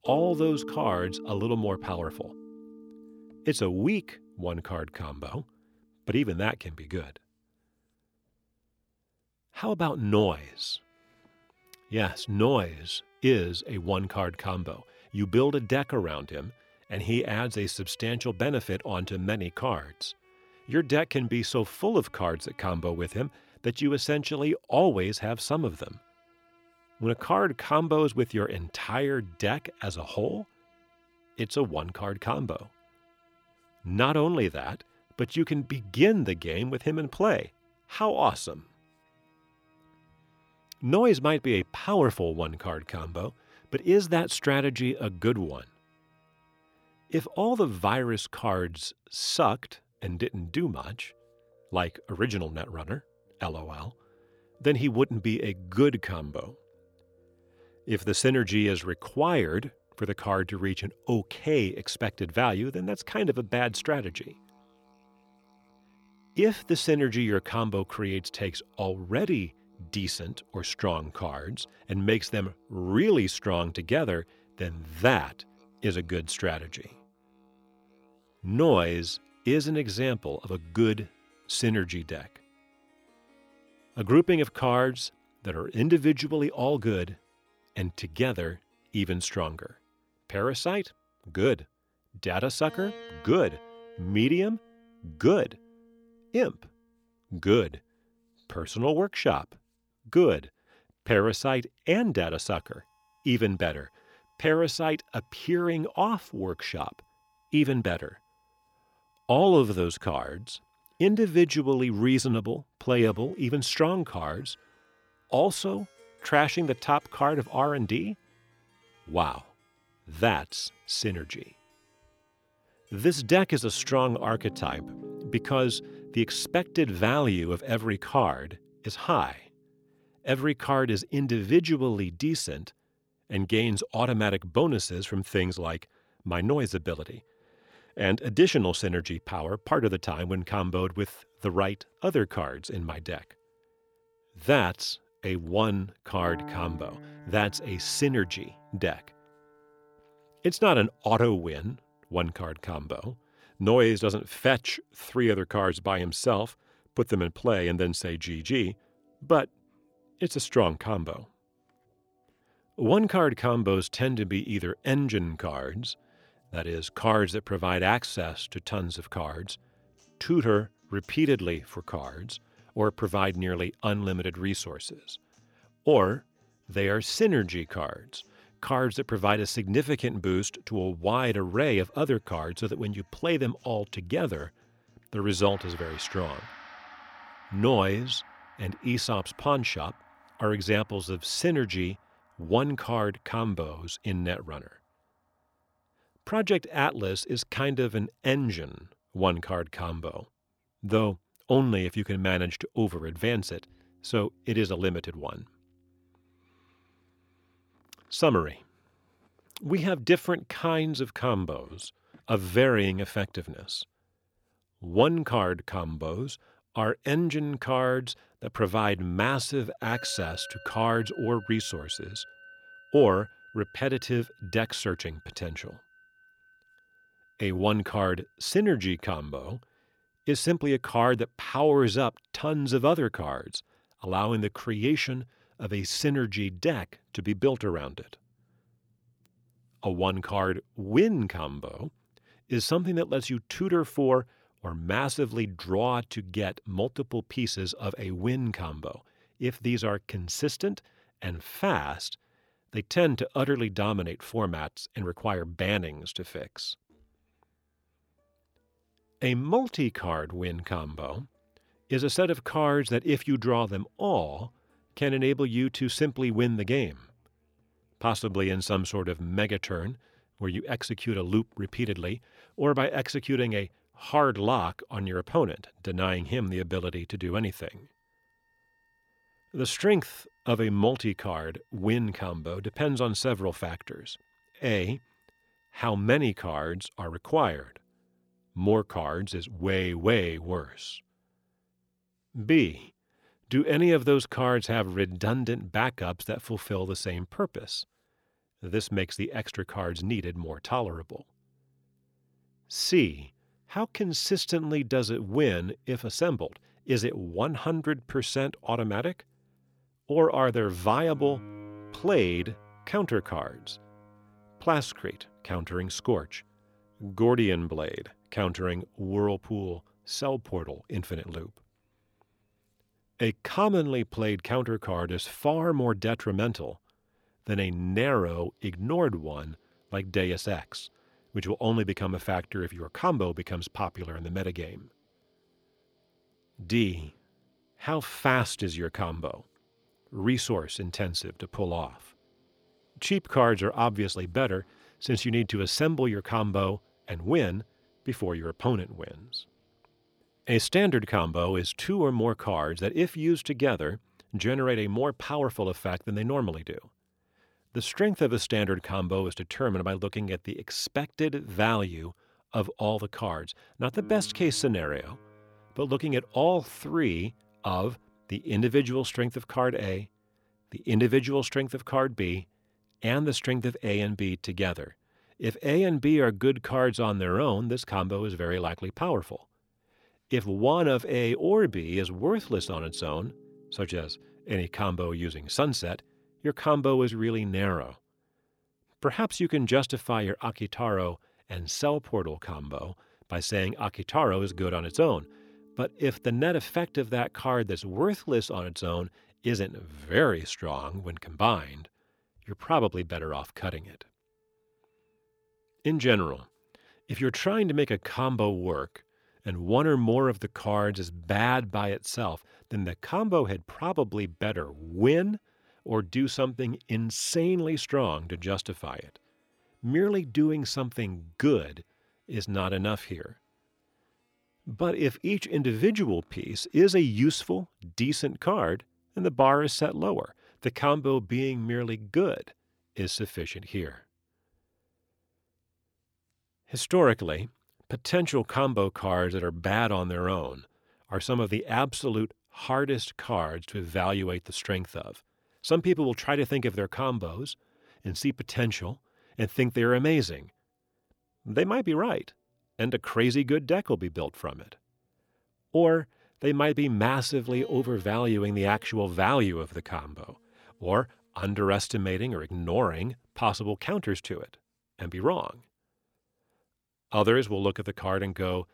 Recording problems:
background music; faint; throughout; 25 dB below the speech

